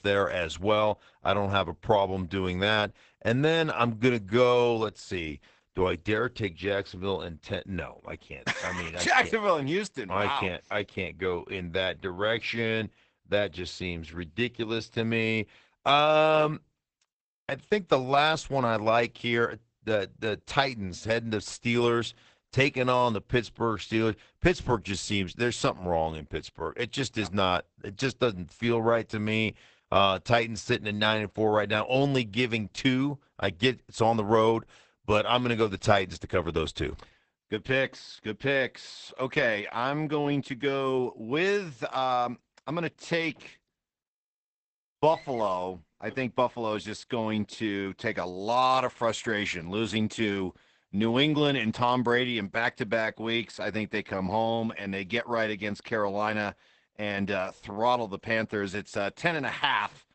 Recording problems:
garbled, watery; badly; nothing above 8 kHz

